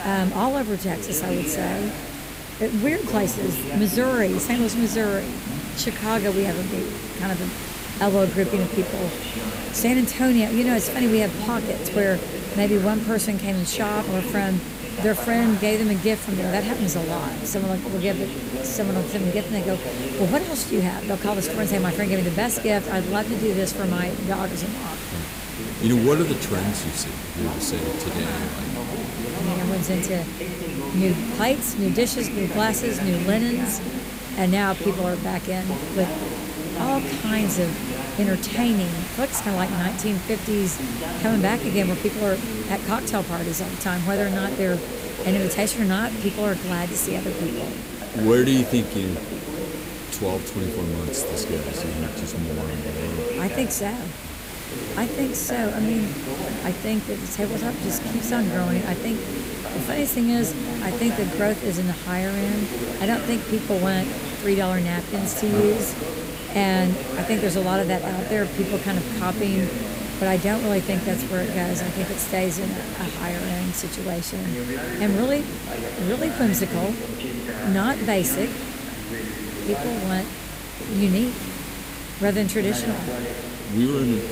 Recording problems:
voice in the background; loud; throughout; 7 dB below the speech
hiss; loud; throughout; 9 dB below the speech
electrical hum; faint; throughout; 50 Hz, 30 dB below the speech

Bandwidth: 15.5 kHz